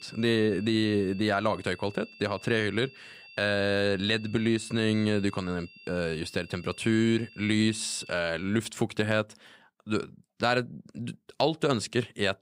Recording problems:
high-pitched whine; faint; until 8 s; 2.5 kHz, 20 dB below the speech

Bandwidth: 15.5 kHz